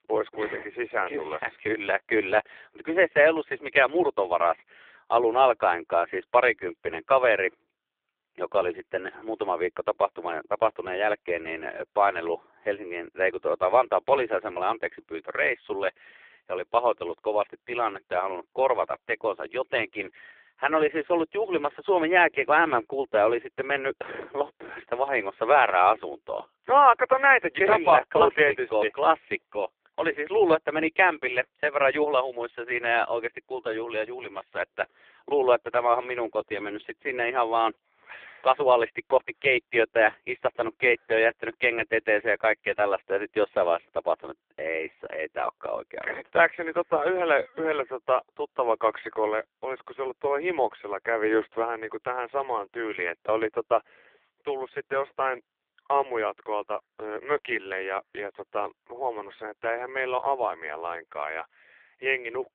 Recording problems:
phone-call audio; poor line
muffled; very slightly; fading above 4 kHz

